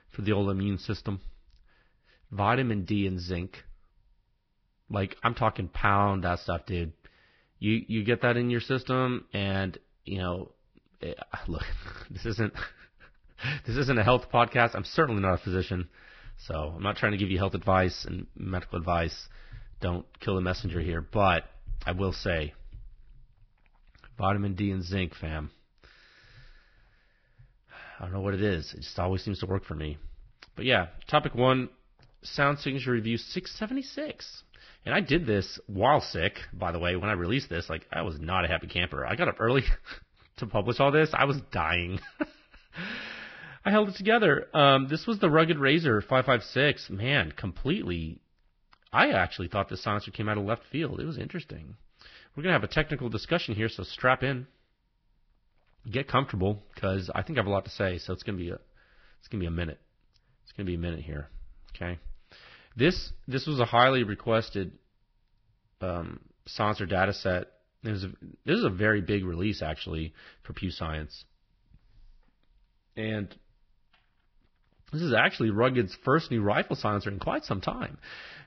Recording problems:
garbled, watery; badly; nothing above 5.5 kHz

